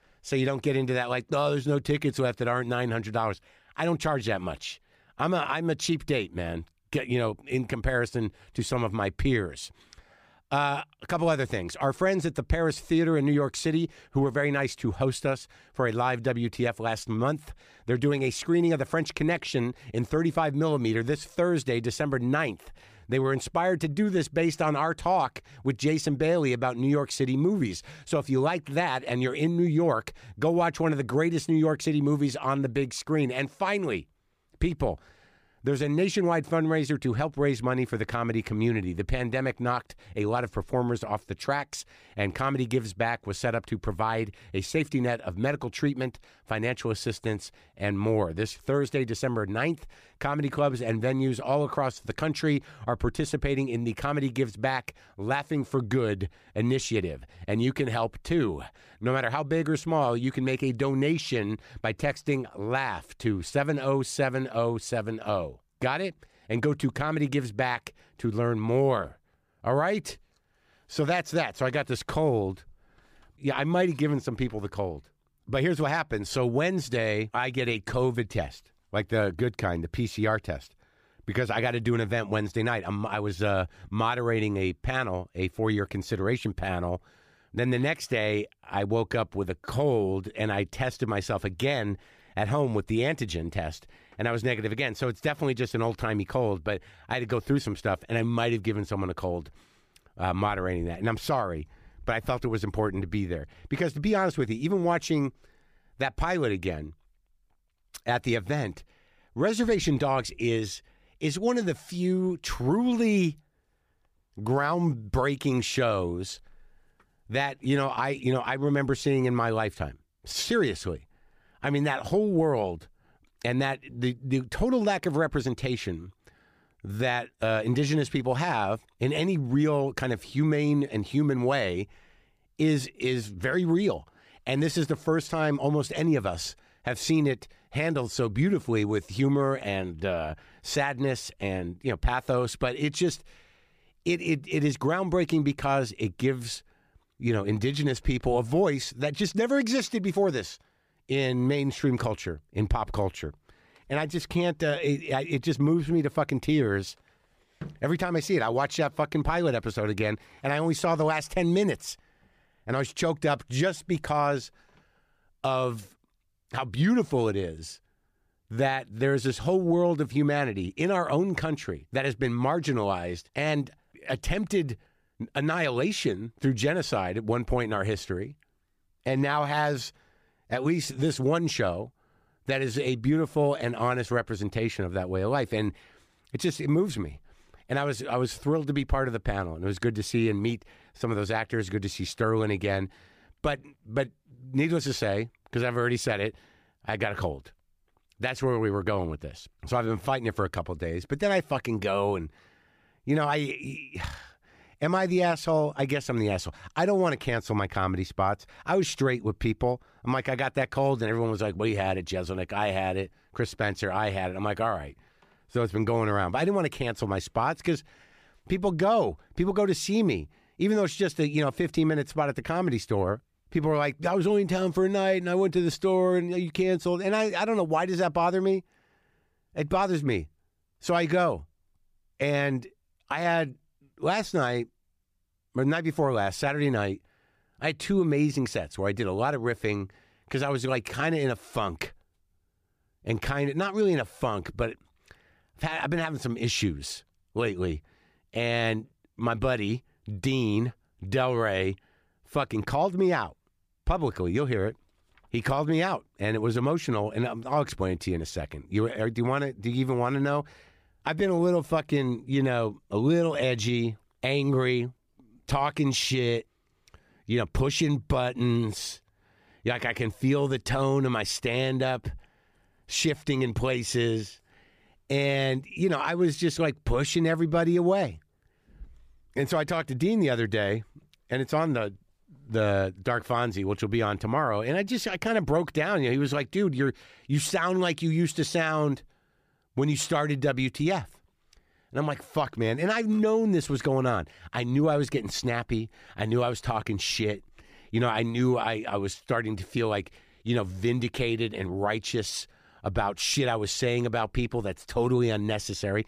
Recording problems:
none

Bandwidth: 15 kHz